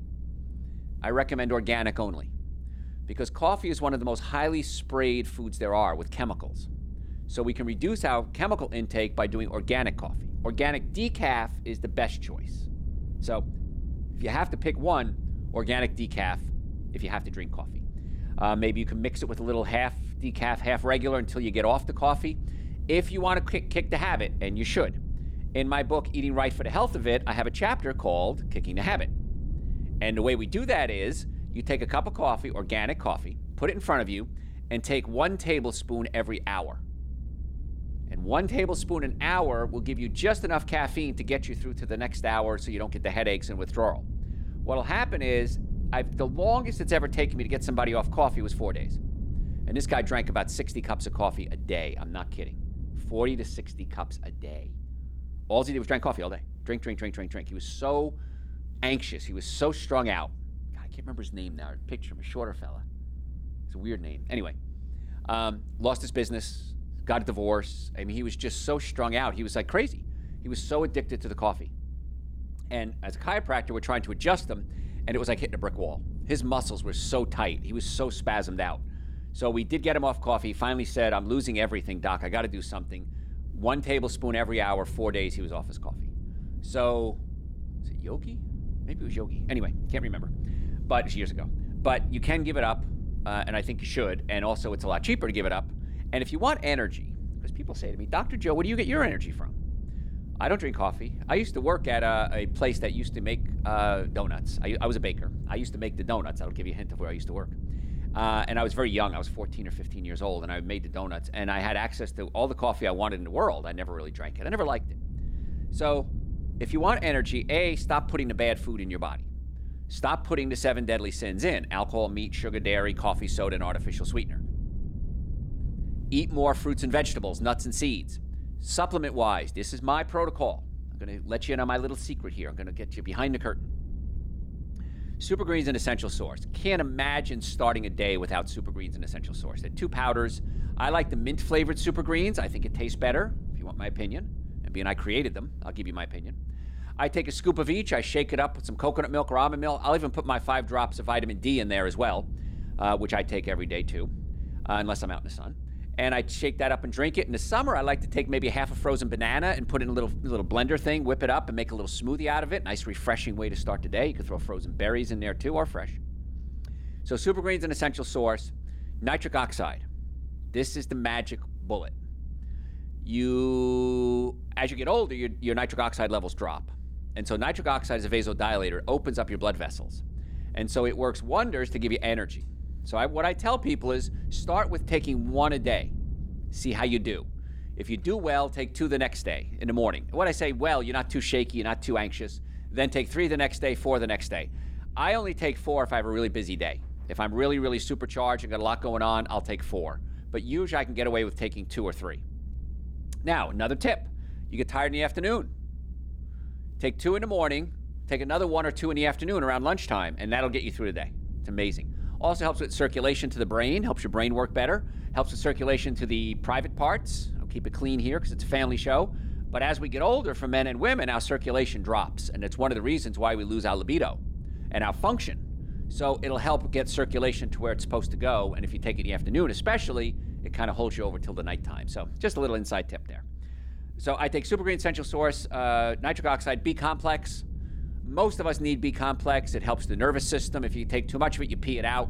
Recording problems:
low rumble; faint; throughout; 25 dB below the speech

